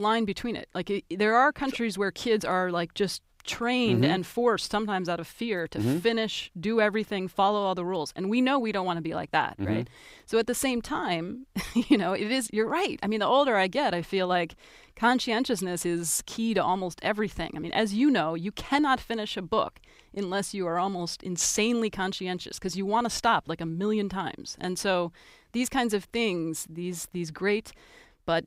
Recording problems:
abrupt cut into speech; at the start

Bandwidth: 15.5 kHz